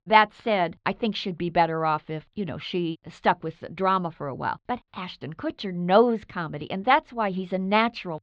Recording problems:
muffled; slightly; fading above 4 kHz

